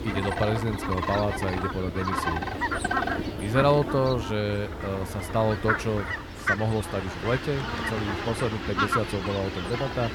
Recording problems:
animal sounds; loud; throughout; 2 dB below the speech

